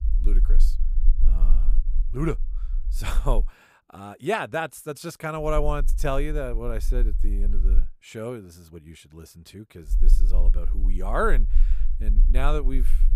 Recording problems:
low rumble; faint; until 3.5 s, from 5.5 to 8 s and from 10 s on; 25 dB below the speech

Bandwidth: 15 kHz